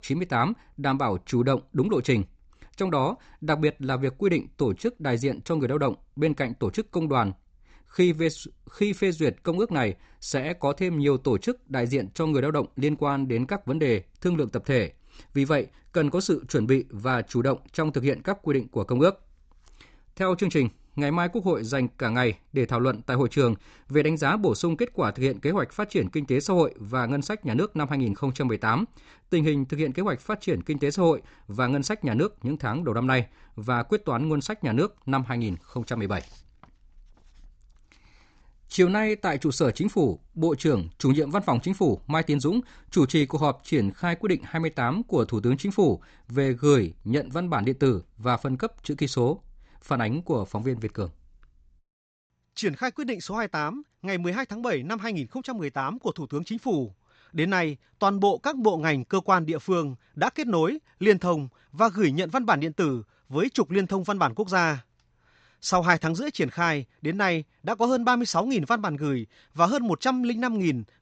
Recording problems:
high frequencies cut off; noticeable; nothing above 8 kHz

